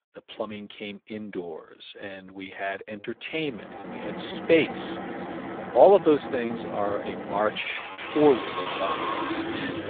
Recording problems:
phone-call audio; poor line; nothing above 3.5 kHz
traffic noise; loud; from 3.5 s on; 8 dB below the speech
choppy; occasionally; 4% of the speech affected

